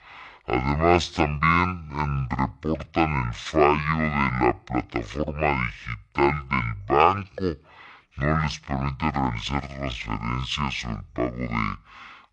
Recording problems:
wrong speed and pitch; too slow and too low; 0.5 times normal speed

